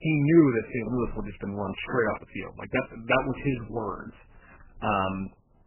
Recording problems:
garbled, watery; badly; nothing above 3 kHz

